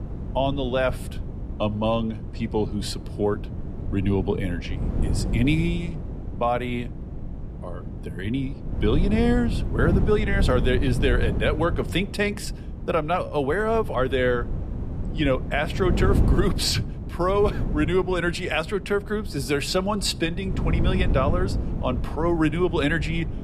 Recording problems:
wind noise on the microphone; occasional gusts; 15 dB below the speech

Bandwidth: 14.5 kHz